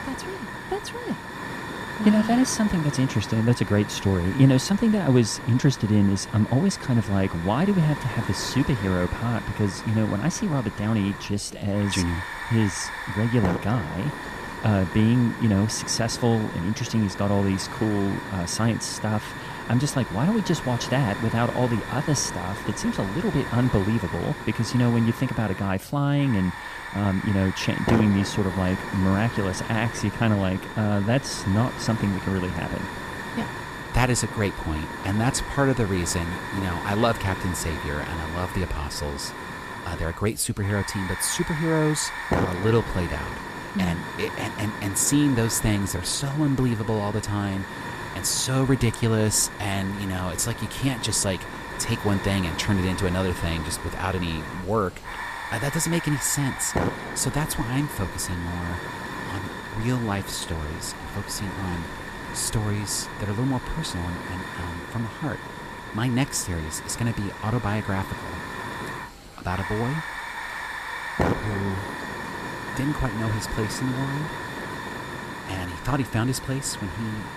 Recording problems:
hiss; loud; throughout; 8 dB below the speech
wind noise on the microphone; occasional gusts; 20 dB below the speech
chatter from many people; faint; throughout; 30 dB below the speech

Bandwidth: 14.5 kHz